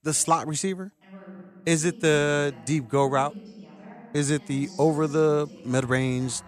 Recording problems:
voice in the background; faint; throughout; 20 dB below the speech

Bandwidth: 15 kHz